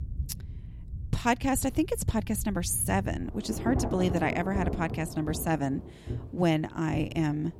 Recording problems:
rain or running water; loud; throughout; 8 dB below the speech

